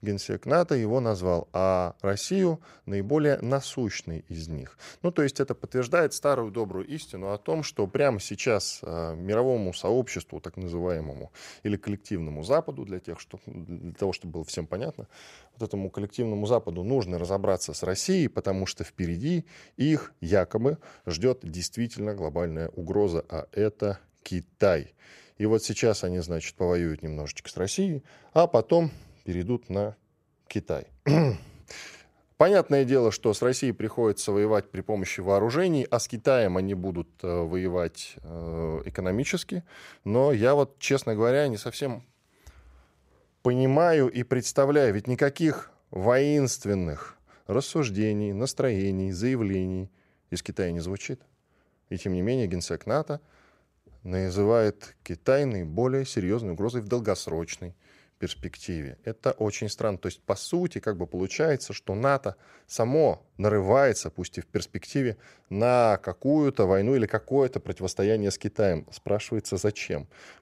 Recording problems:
none

